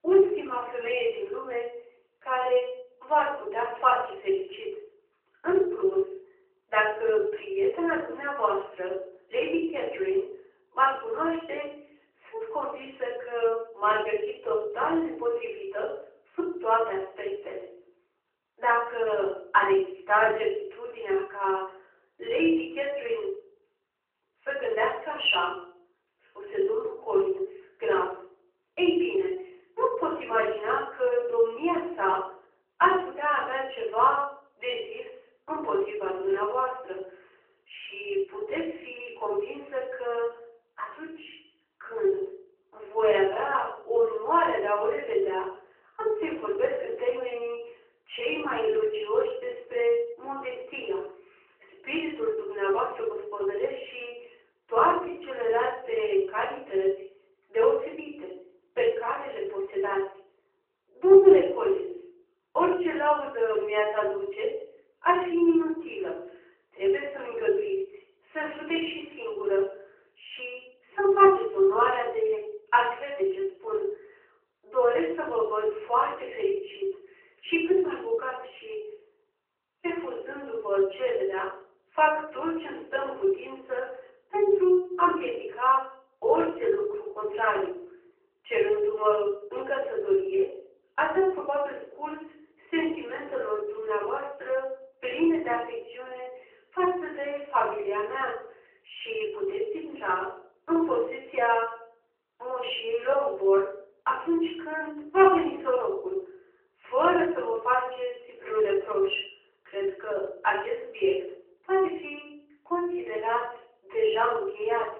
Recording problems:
off-mic speech; far
room echo; noticeable; dies away in 0.5 s
phone-call audio; nothing above 3 kHz

